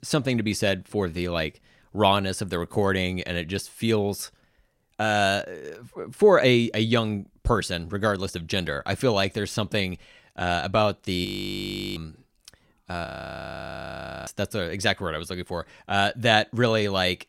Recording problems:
audio freezing; at 11 s for 0.5 s and at 13 s for 1 s

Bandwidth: 16 kHz